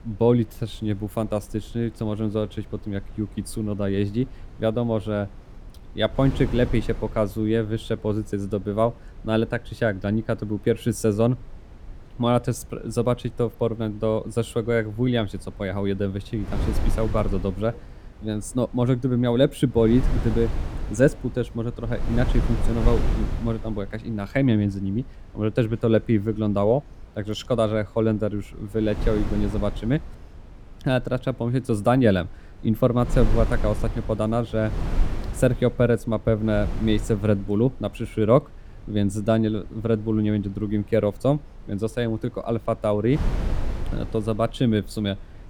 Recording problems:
wind noise on the microphone; occasional gusts; 15 dB below the speech

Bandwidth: 18.5 kHz